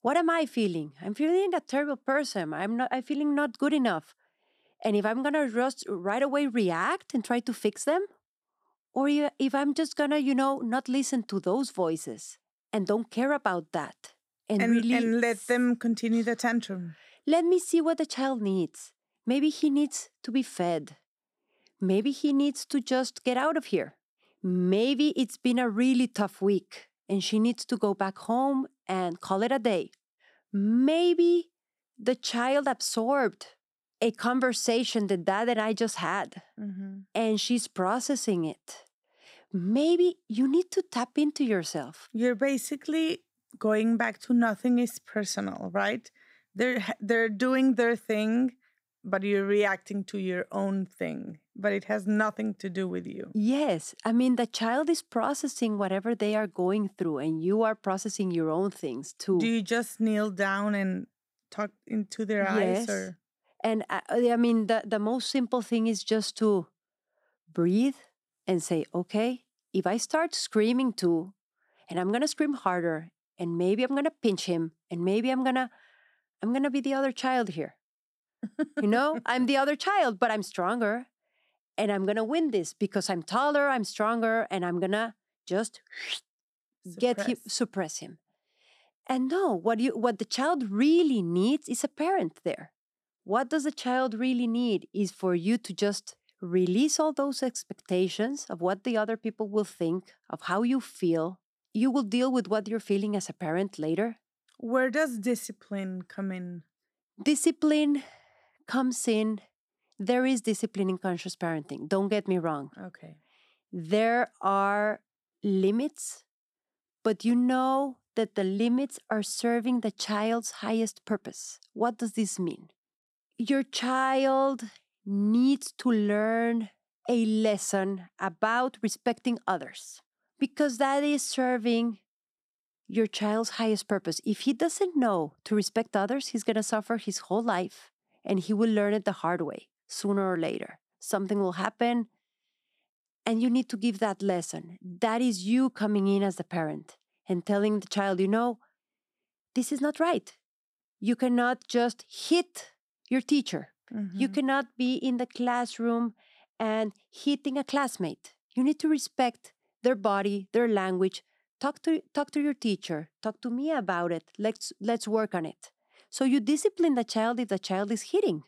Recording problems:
none

